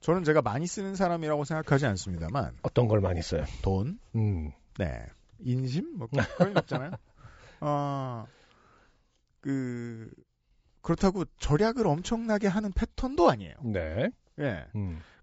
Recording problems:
high frequencies cut off; noticeable; nothing above 8 kHz

